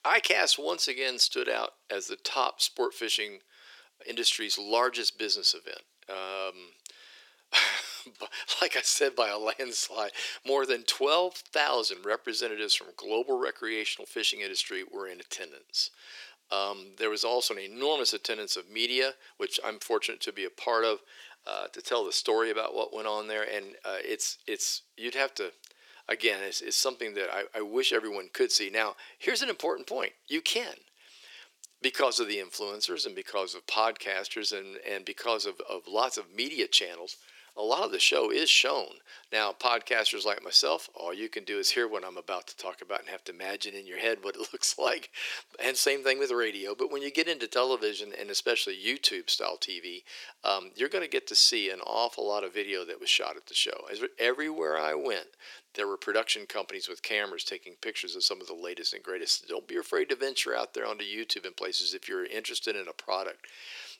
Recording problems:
thin; very; fading below 350 Hz

